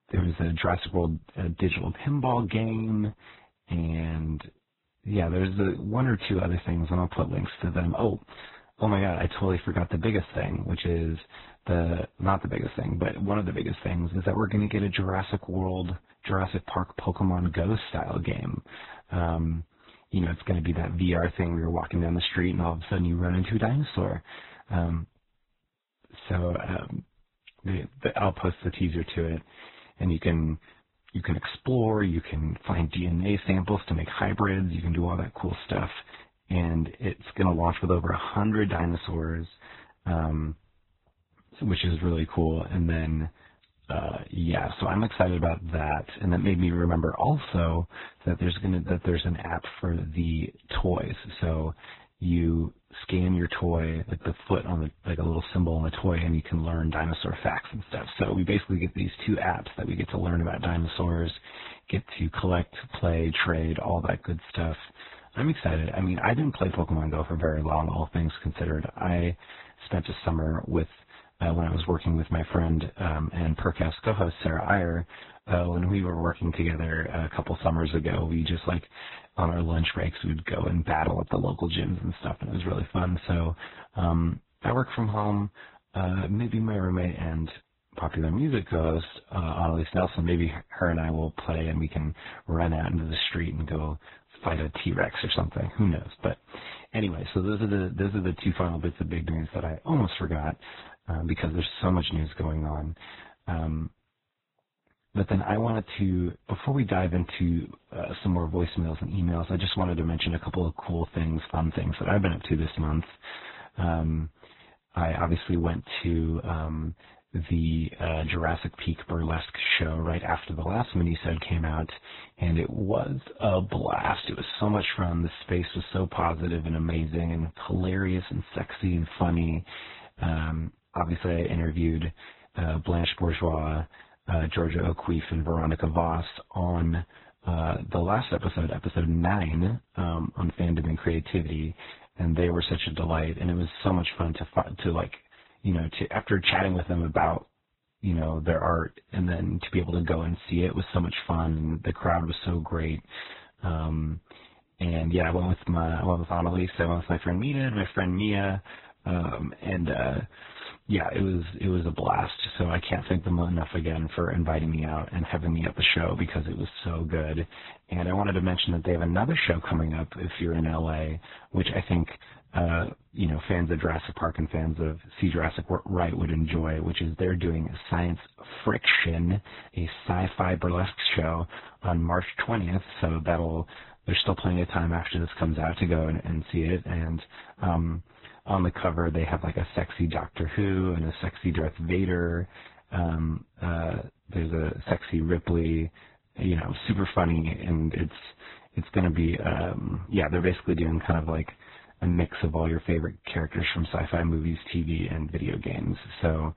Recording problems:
garbled, watery; badly
high frequencies cut off; severe; nothing above 4 kHz

